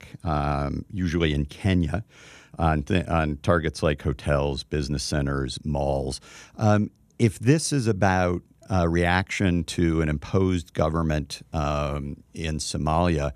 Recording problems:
none

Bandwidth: 14.5 kHz